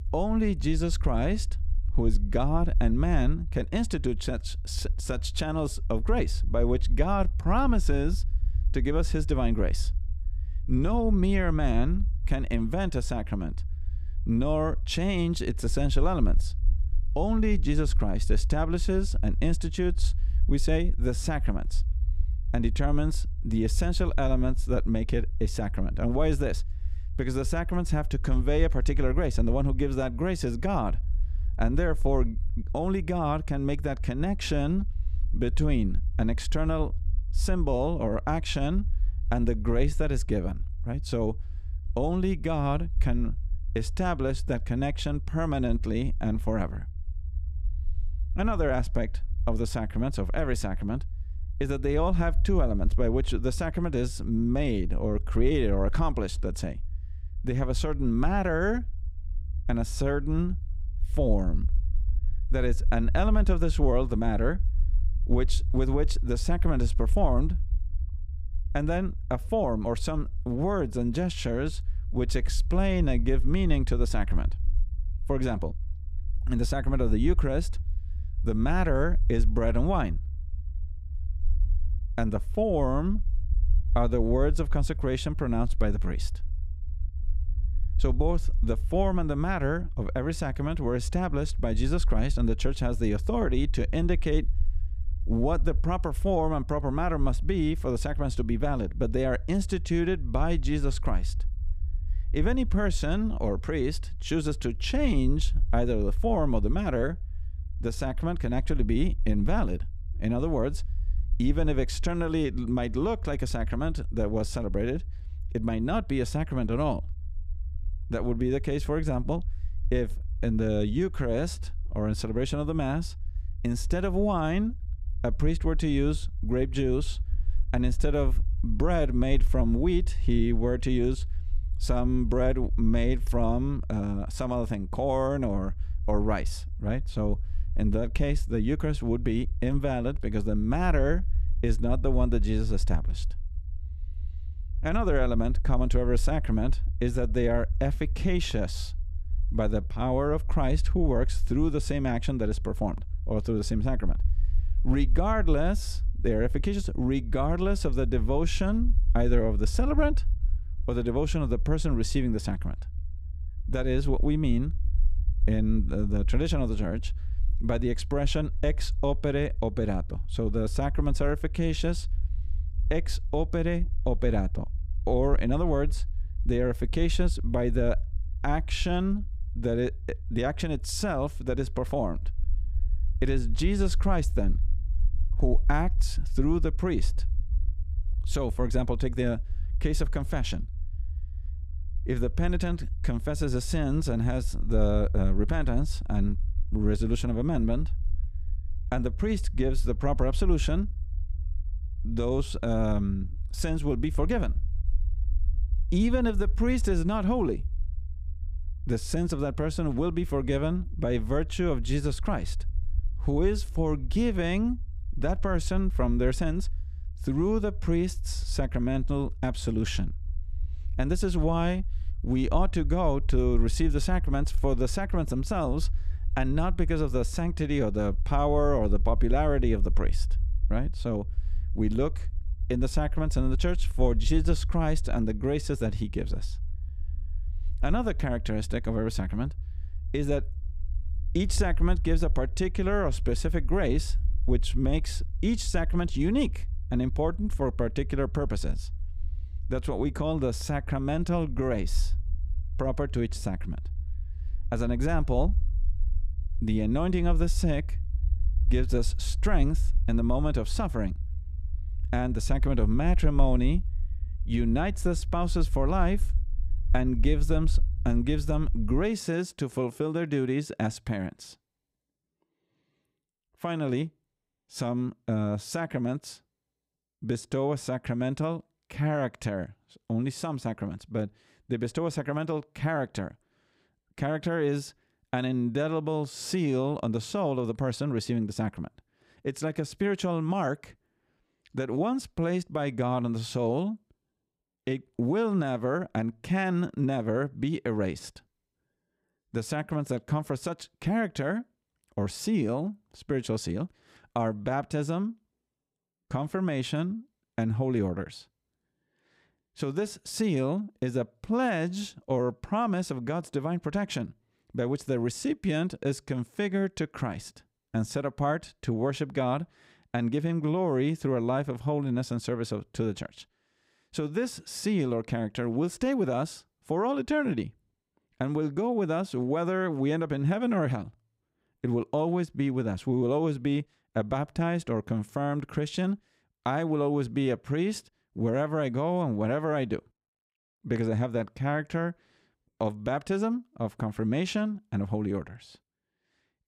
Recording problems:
low rumble; faint; until 4:29; 20 dB below the speech

